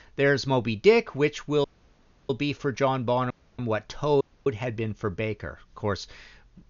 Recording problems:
high frequencies cut off; noticeable; nothing above 7 kHz
audio cutting out; at 1.5 s for 0.5 s, at 3.5 s and at 4 s

